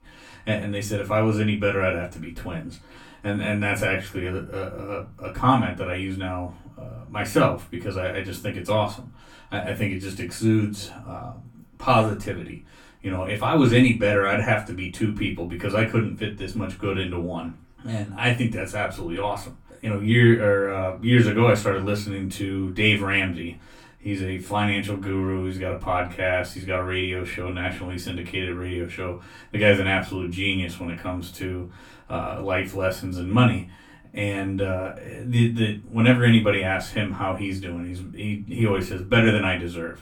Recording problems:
off-mic speech; far
room echo; very slight; dies away in 0.2 s

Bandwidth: 18 kHz